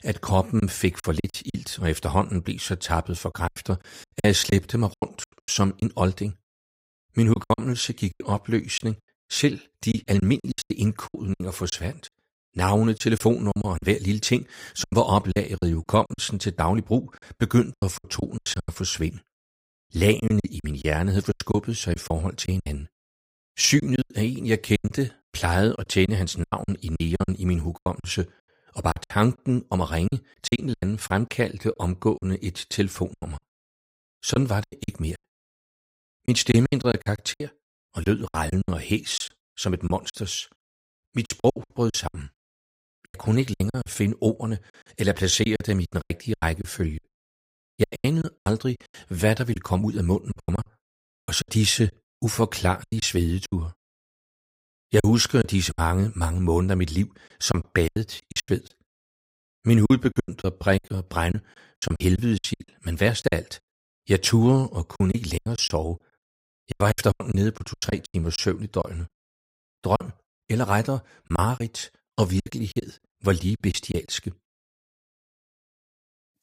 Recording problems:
choppy; very; 14% of the speech affected

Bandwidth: 15.5 kHz